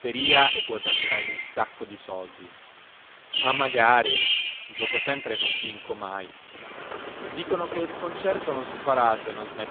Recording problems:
phone-call audio; poor line
animal sounds; very loud; throughout; 1 dB above the speech
rain or running water; loud; throughout; 10 dB below the speech
crackling; noticeable; at 3.5 s; 20 dB below the speech
hiss; faint; throughout; 20 dB below the speech

